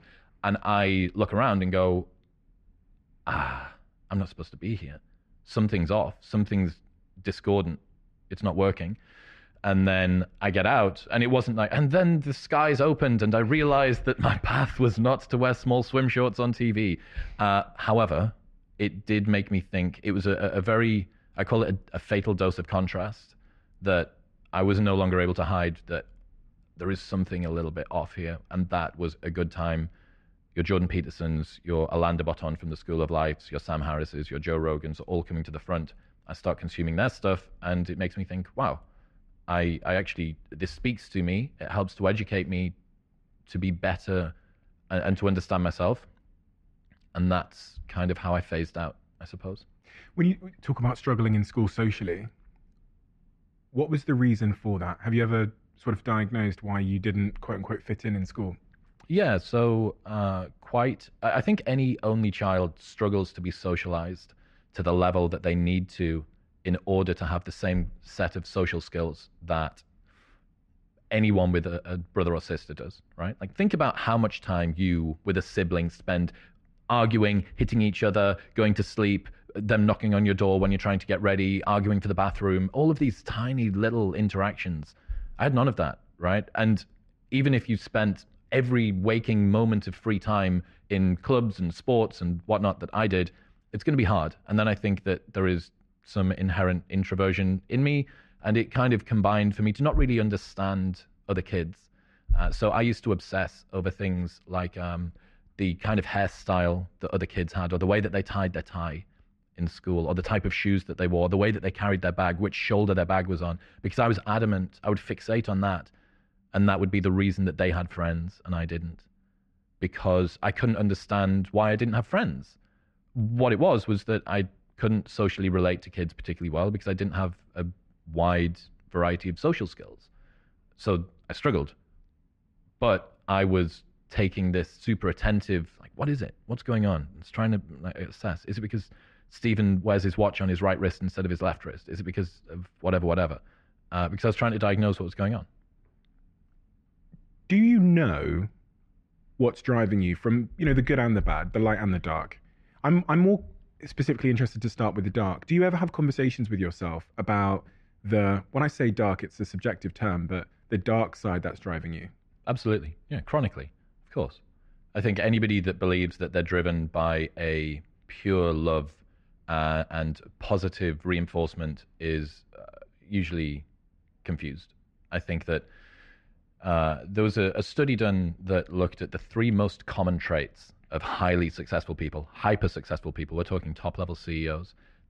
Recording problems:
muffled; slightly; fading above 2 kHz

